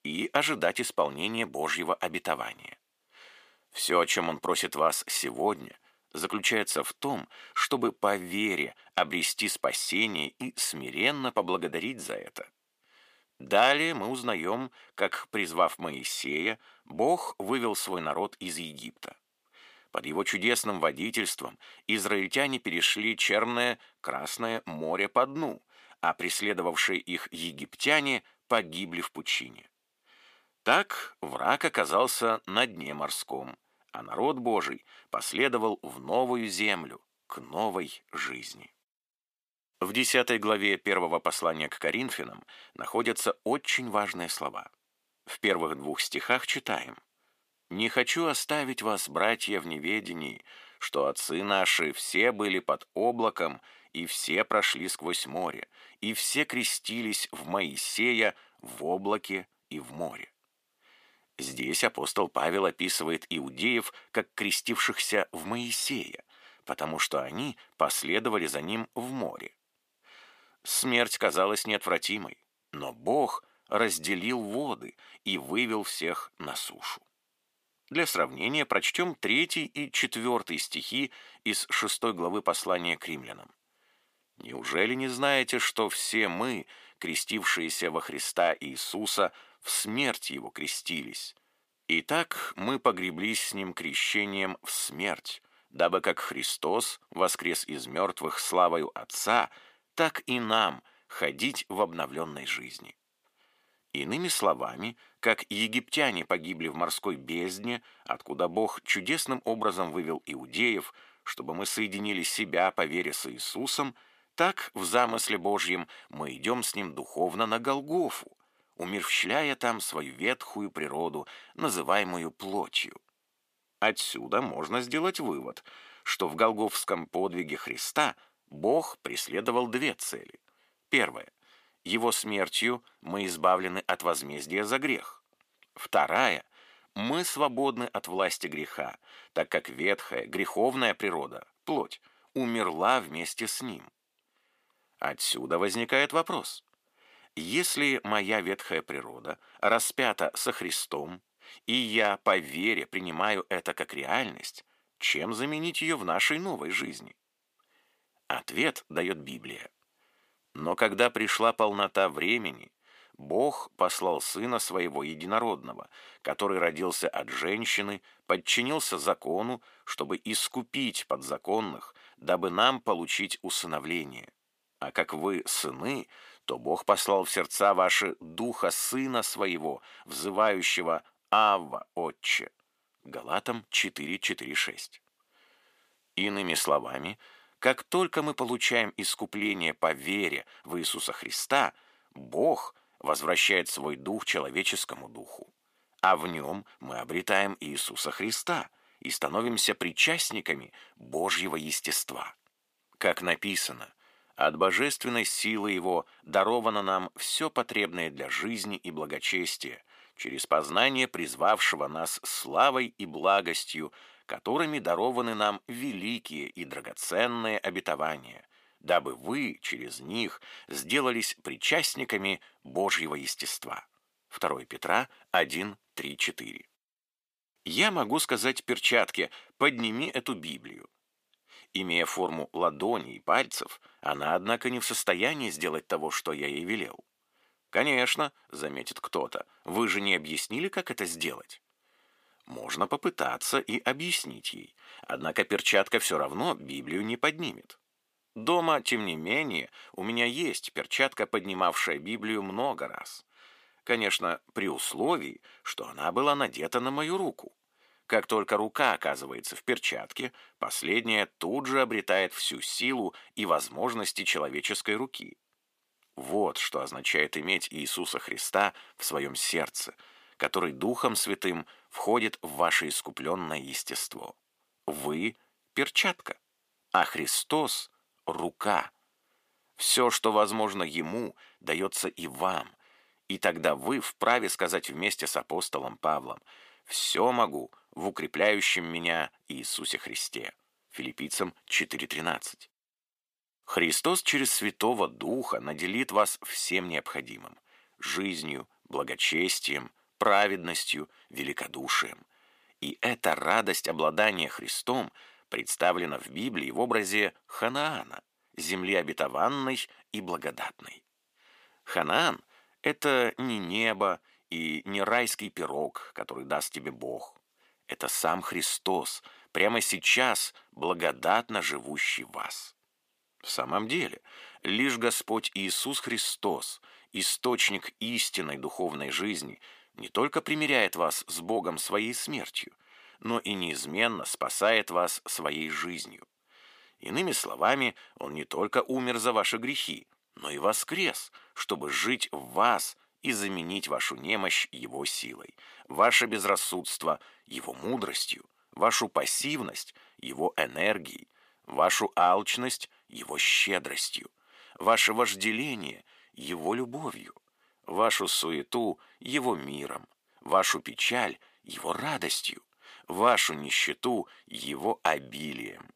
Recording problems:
thin; somewhat; fading below 400 Hz

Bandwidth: 15 kHz